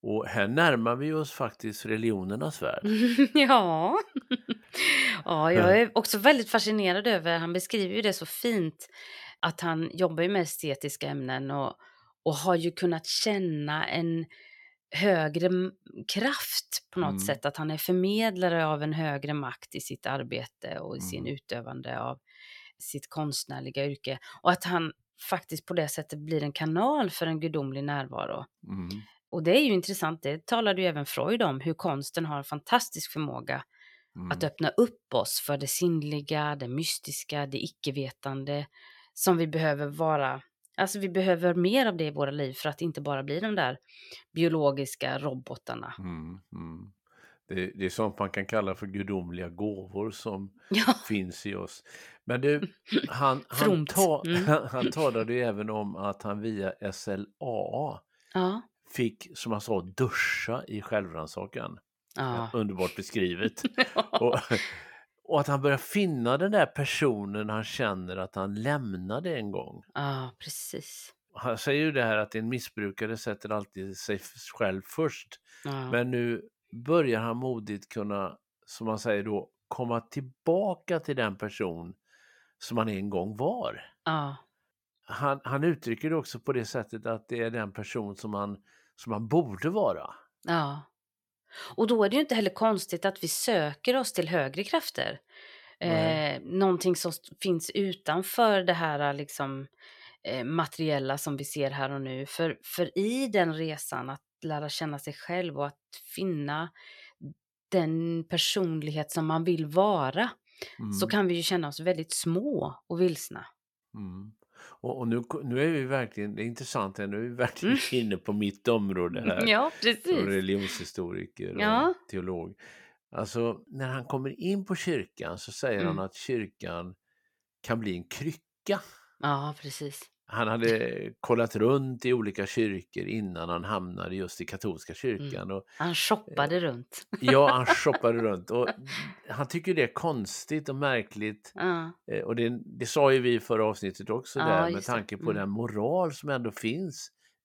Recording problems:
none

